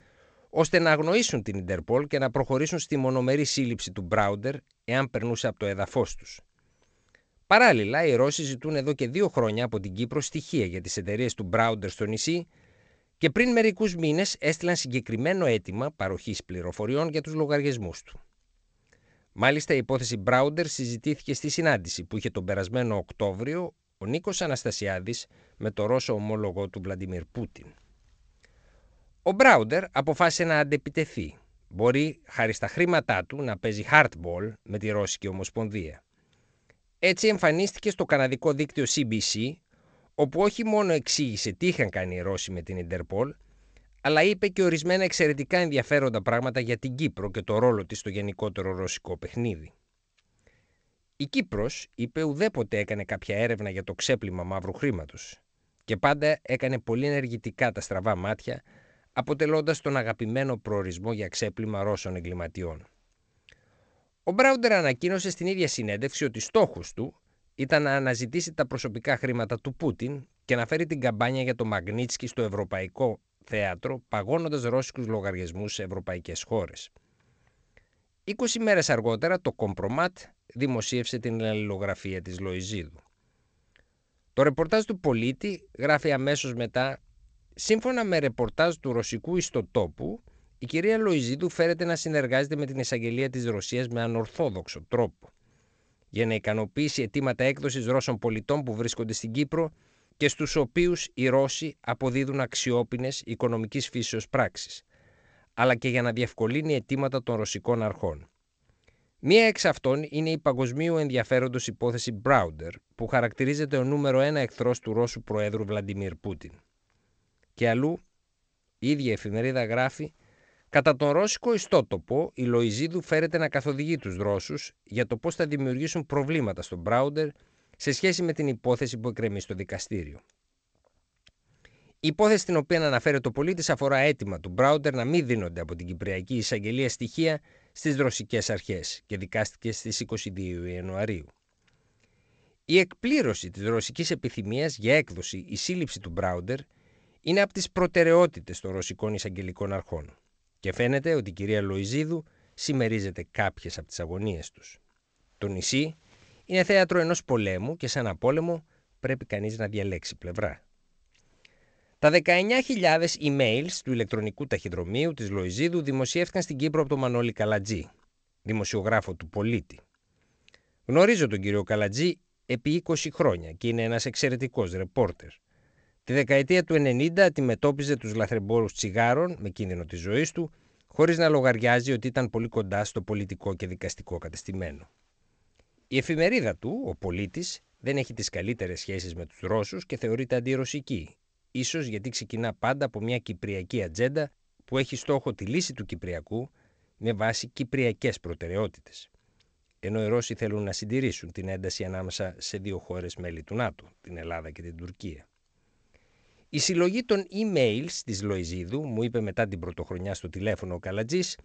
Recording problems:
garbled, watery; slightly; nothing above 7.5 kHz

